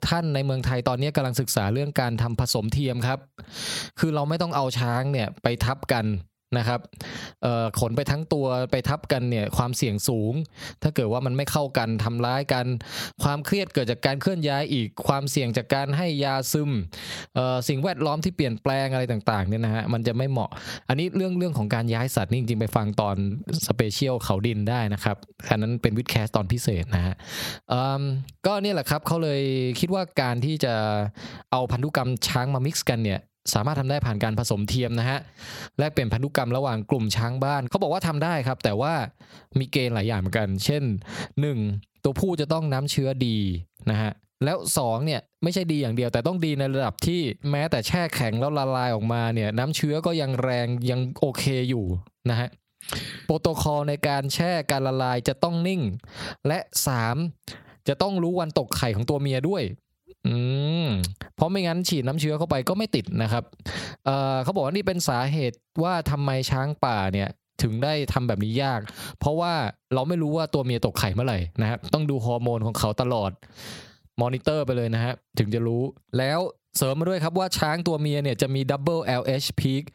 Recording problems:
squashed, flat; somewhat

